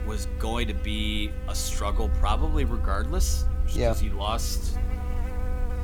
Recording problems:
electrical hum; noticeable; throughout; 50 Hz, 10 dB below the speech
low rumble; noticeable; throughout; 20 dB below the speech

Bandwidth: 18 kHz